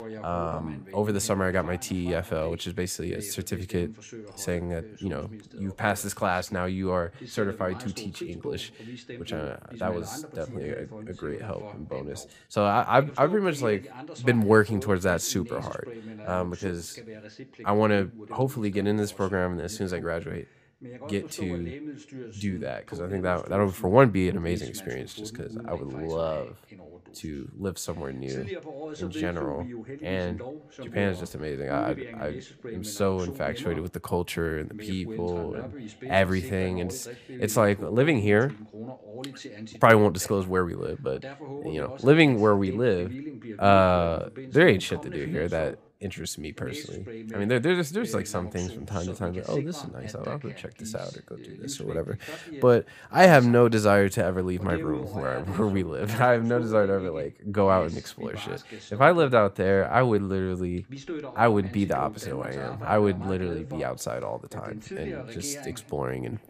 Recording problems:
voice in the background; noticeable; throughout; 15 dB below the speech

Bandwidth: 15 kHz